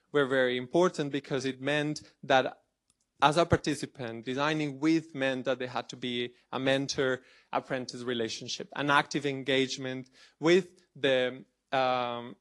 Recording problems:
garbled, watery; slightly; nothing above 11 kHz

